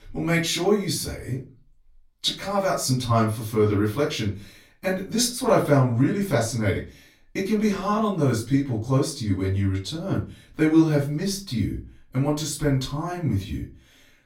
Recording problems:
off-mic speech; far
room echo; slight; dies away in 0.3 s

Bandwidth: 16 kHz